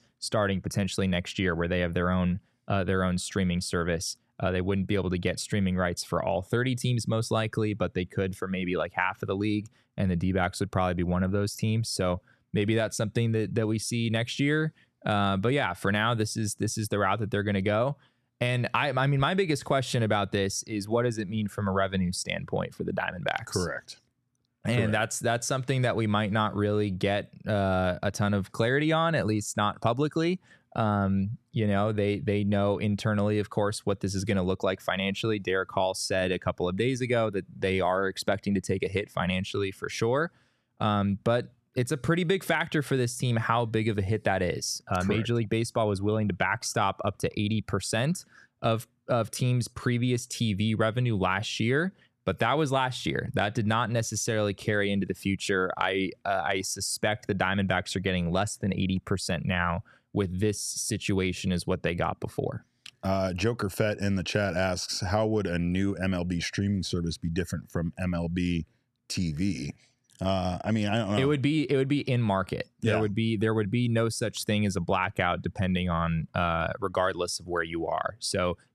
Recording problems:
none

